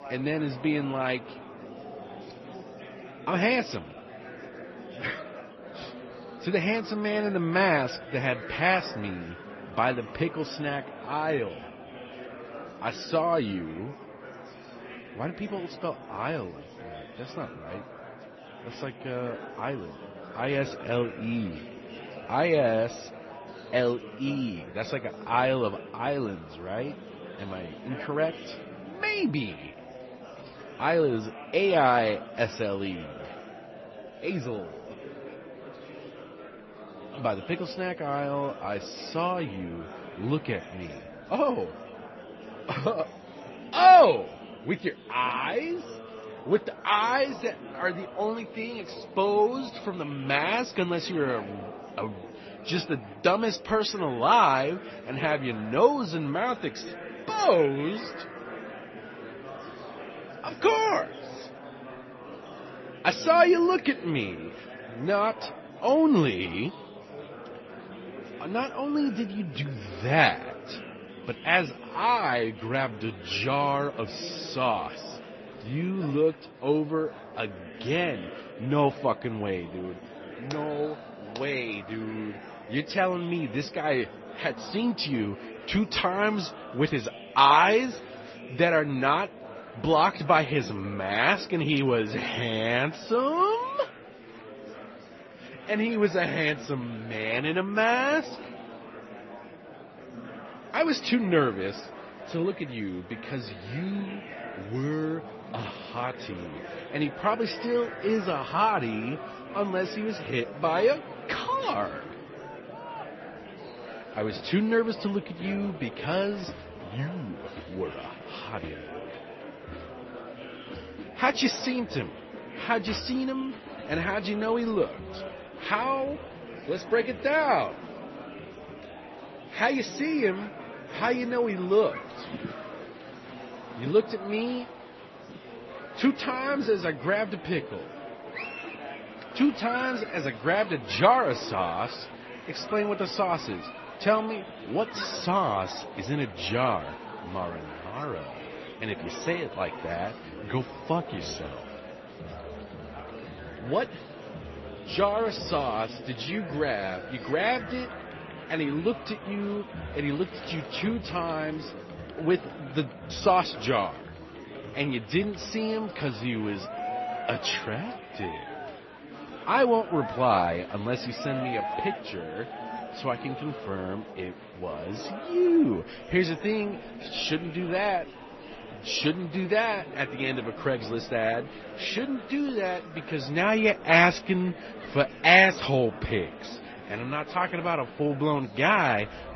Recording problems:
garbled, watery; slightly; nothing above 6 kHz
murmuring crowd; noticeable; throughout; 15 dB below the speech

